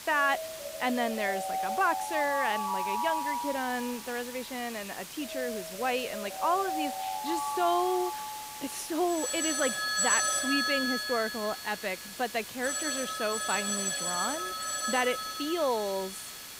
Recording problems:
alarms or sirens; loud; throughout; as loud as the speech
hiss; loud; throughout; 9 dB below the speech

